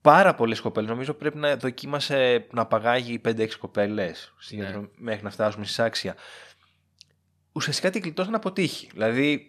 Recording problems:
none

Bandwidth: 13.5 kHz